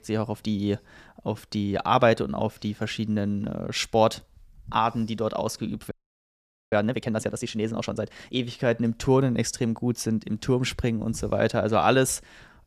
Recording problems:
audio freezing; at 6 s for 1 s

